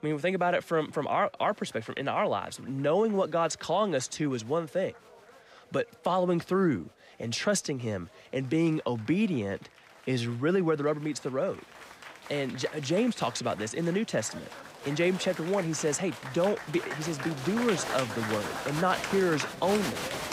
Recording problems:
crowd noise; loud; throughout; 8 dB below the speech

